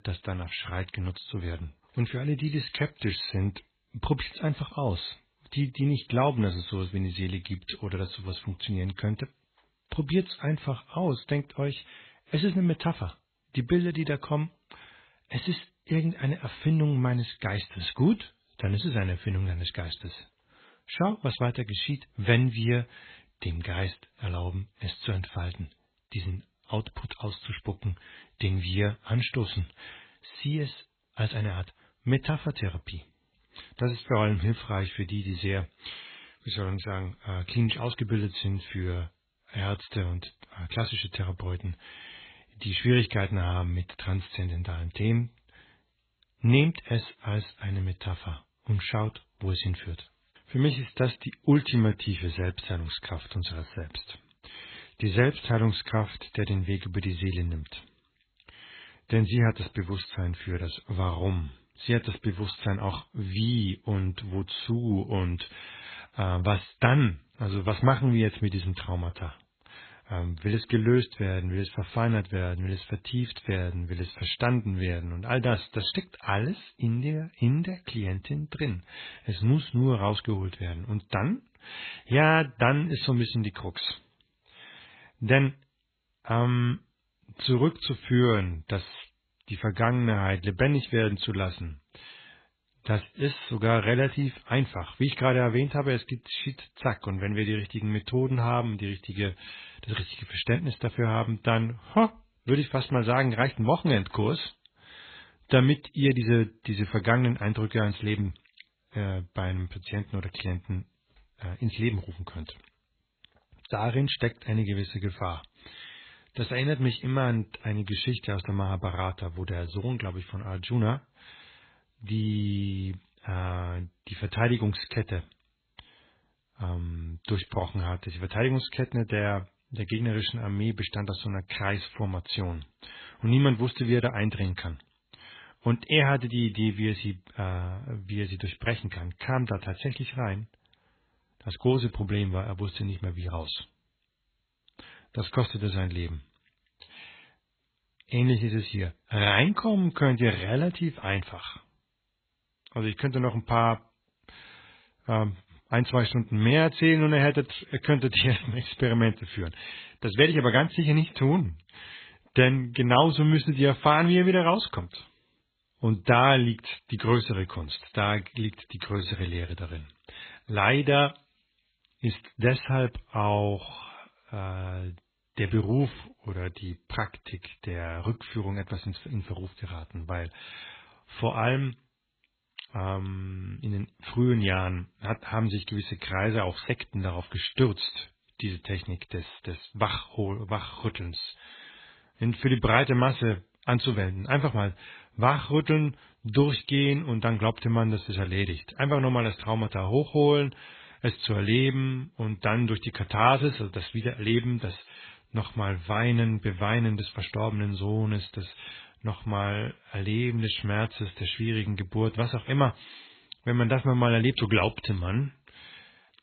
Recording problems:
garbled, watery; badly; nothing above 4 kHz

